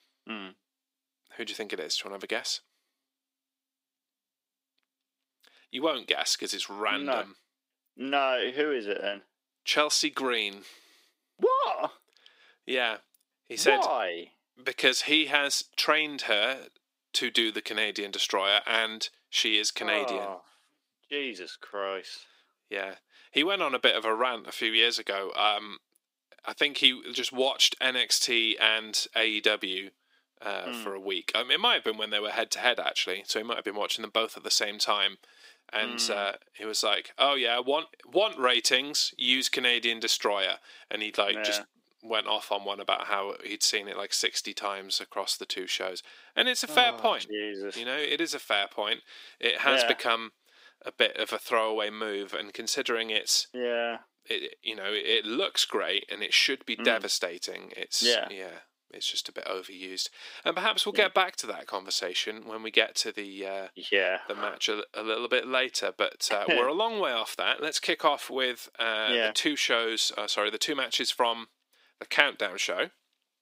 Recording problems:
thin; somewhat; fading below 300 Hz

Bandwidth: 15.5 kHz